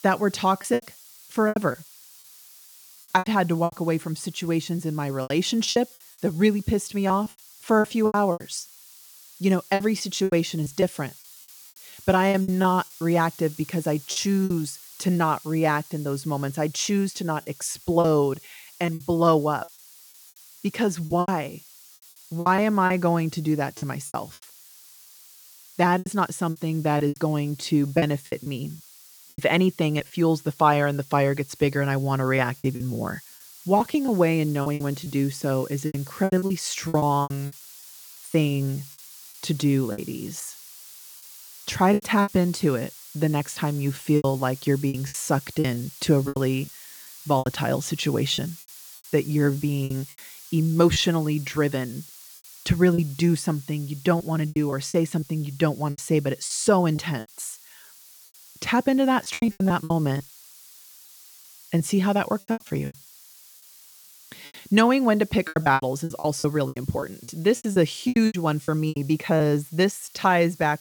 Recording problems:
hiss; noticeable; throughout; 20 dB below the speech
choppy; very; 11% of the speech affected

